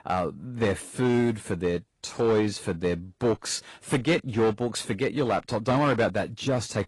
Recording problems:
distortion; slight; 5% of the sound clipped
garbled, watery; slightly; nothing above 11 kHz

